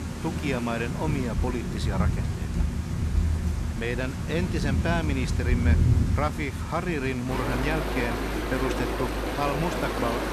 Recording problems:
rain or running water; very loud; throughout; 2 dB above the speech

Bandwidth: 13.5 kHz